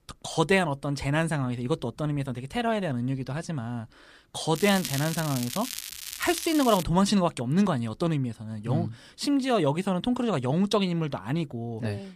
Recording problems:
crackling; loud; from 4.5 to 7 s; 7 dB below the speech

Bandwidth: 14.5 kHz